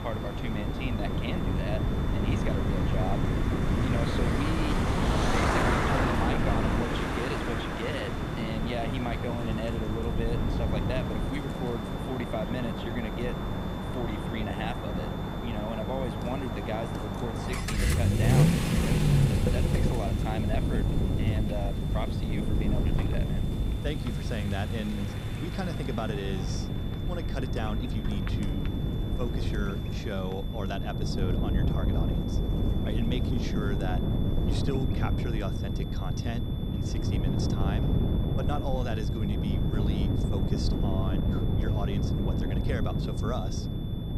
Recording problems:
traffic noise; very loud; throughout; 3 dB above the speech
wind noise on the microphone; heavy; 2 dB below the speech
electrical hum; noticeable; throughout; 50 Hz, 15 dB below the speech
high-pitched whine; noticeable; throughout; 3.5 kHz, 15 dB below the speech
rain or running water; faint; throughout; 25 dB below the speech

